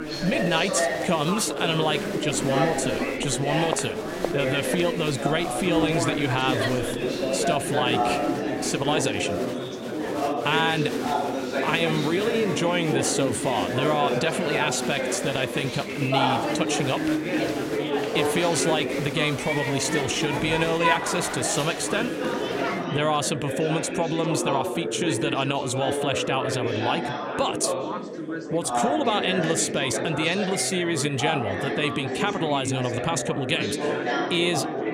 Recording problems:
chatter from many people; loud; throughout; 1 dB below the speech

